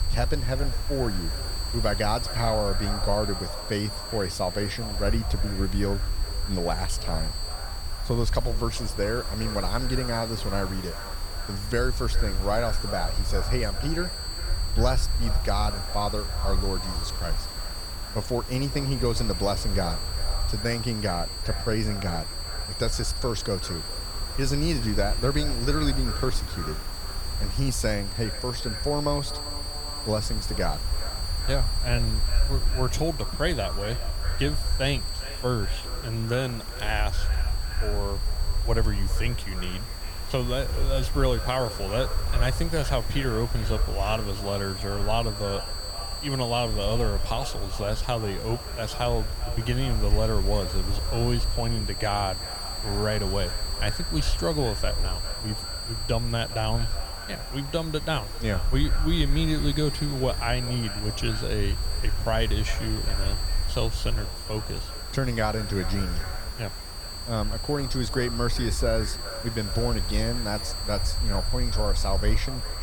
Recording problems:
echo of what is said; noticeable; throughout; 400 ms later, 15 dB below the speech
high-pitched whine; loud; throughout; 4.5 kHz, 6 dB below the speech
hiss; noticeable; throughout; 15 dB below the speech
low rumble; faint; throughout; 25 dB below the speech

